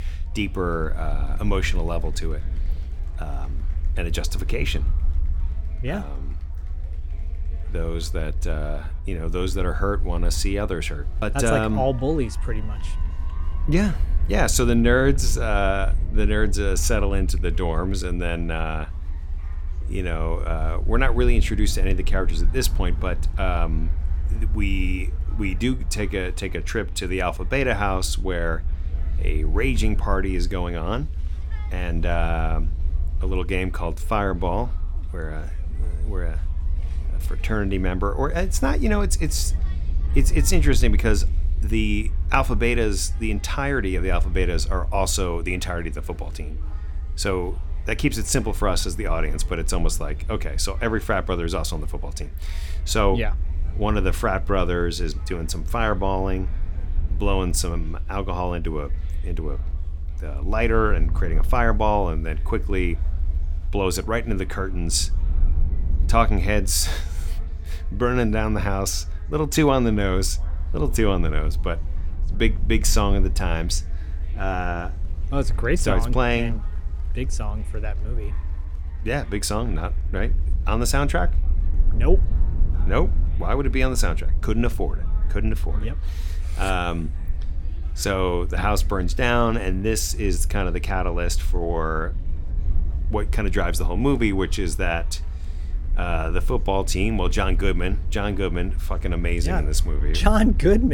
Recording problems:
chatter from many people; faint; throughout; 25 dB below the speech
low rumble; faint; throughout; 20 dB below the speech
abrupt cut into speech; at the end

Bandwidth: 18 kHz